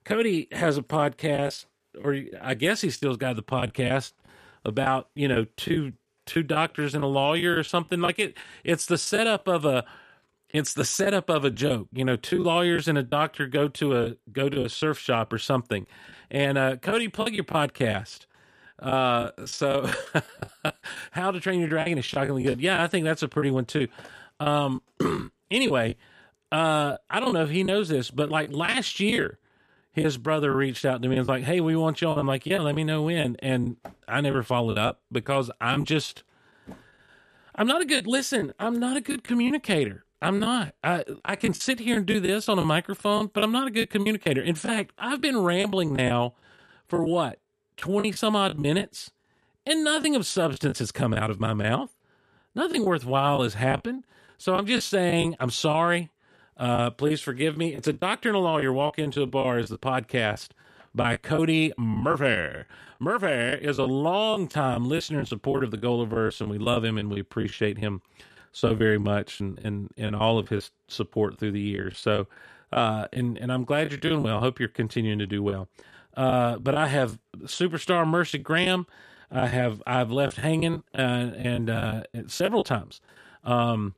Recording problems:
choppy; very; 8% of the speech affected

